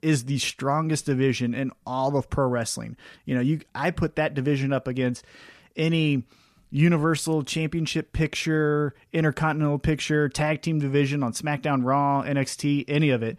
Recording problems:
none

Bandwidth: 14.5 kHz